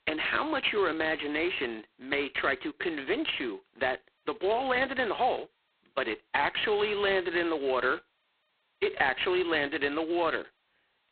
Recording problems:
phone-call audio; poor line; nothing above 4 kHz

